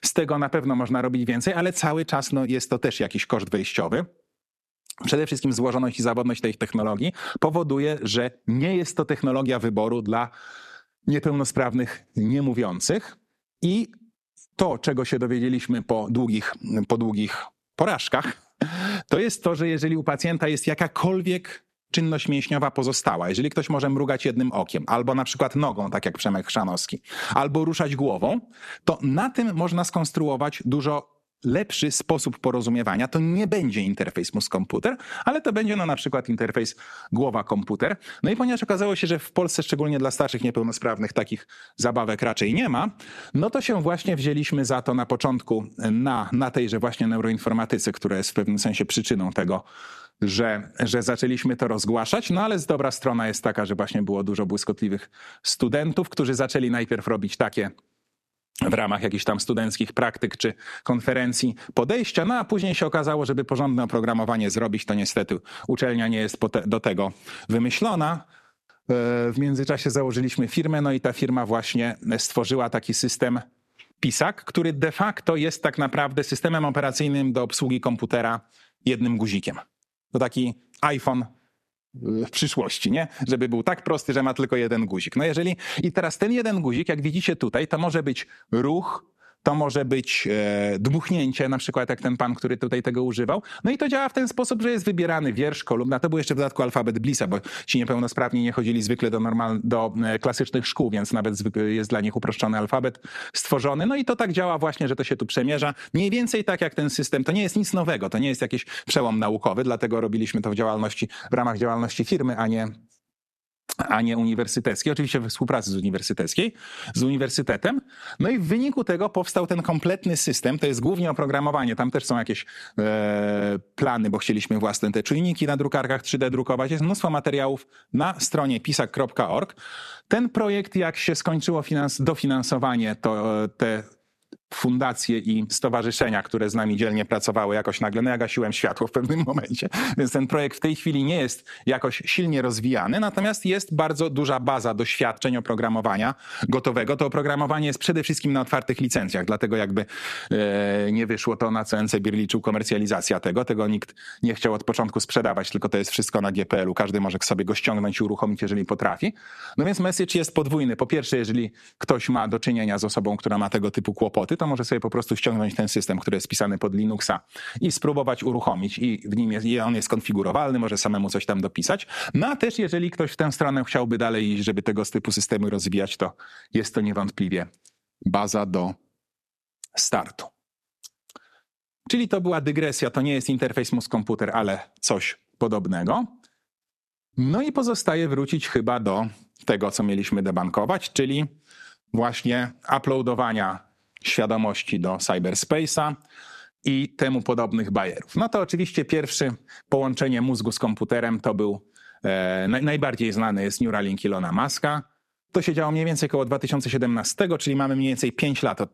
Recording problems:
squashed, flat; somewhat

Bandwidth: 13.5 kHz